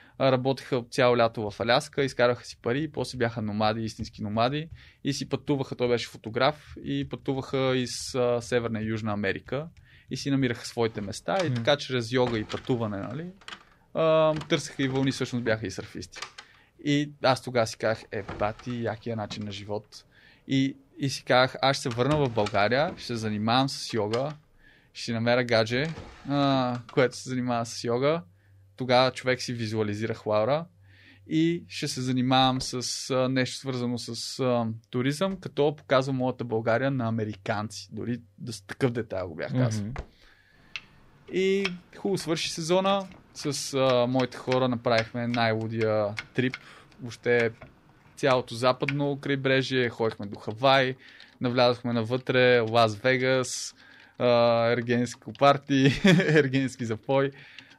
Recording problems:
household noises; noticeable; throughout; 15 dB below the speech

